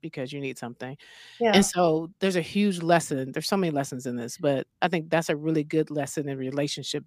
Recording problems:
none

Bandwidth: 15 kHz